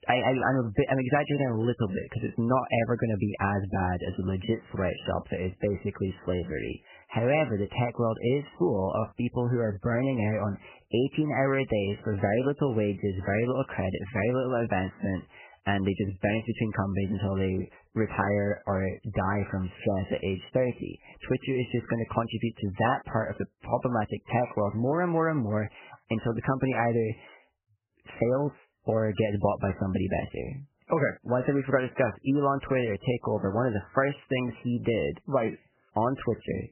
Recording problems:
garbled, watery; badly; nothing above 3 kHz

